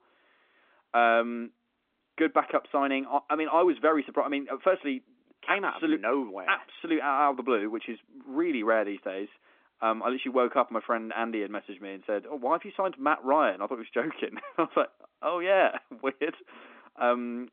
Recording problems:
phone-call audio; nothing above 3.5 kHz

